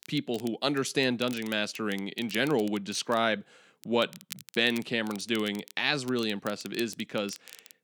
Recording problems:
crackle, like an old record; noticeable; 20 dB below the speech

